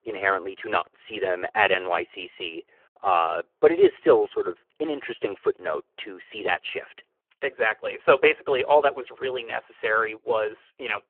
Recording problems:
phone-call audio; poor line

